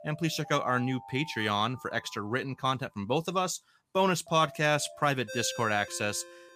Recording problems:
alarms or sirens; noticeable; throughout; 15 dB below the speech

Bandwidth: 15 kHz